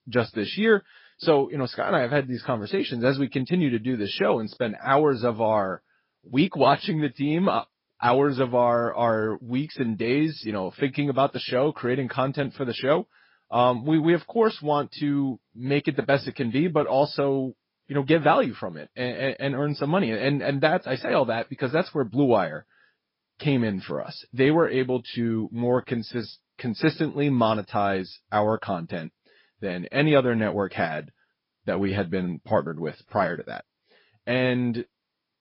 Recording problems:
high frequencies cut off; noticeable; nothing above 5.5 kHz
garbled, watery; slightly

